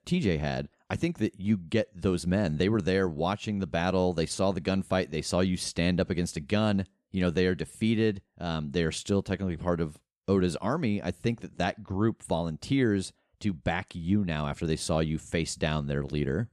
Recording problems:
none

